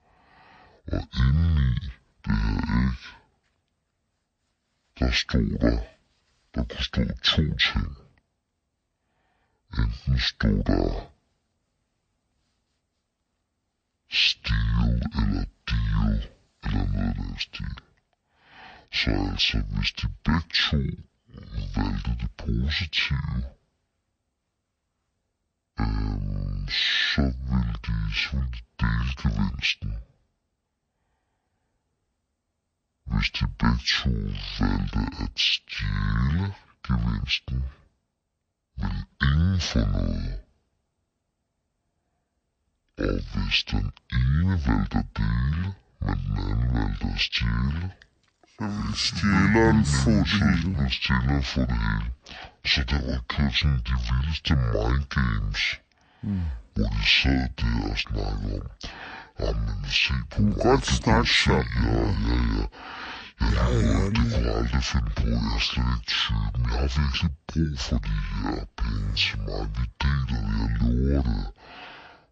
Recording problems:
wrong speed and pitch; too slow and too low; 0.6 times normal speed

